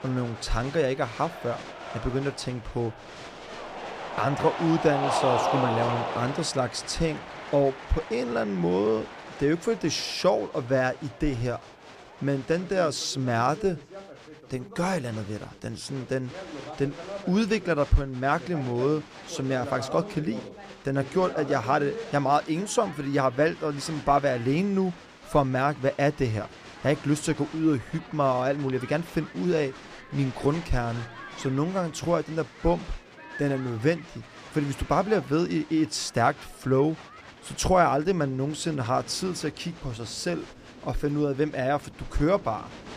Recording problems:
crowd noise; noticeable; throughout; 10 dB below the speech

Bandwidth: 14.5 kHz